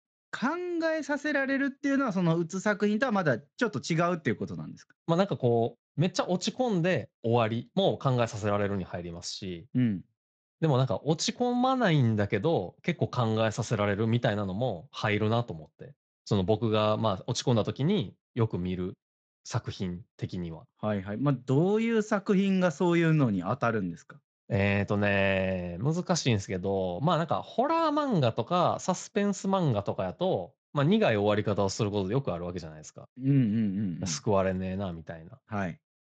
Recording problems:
garbled, watery; slightly; nothing above 7.5 kHz

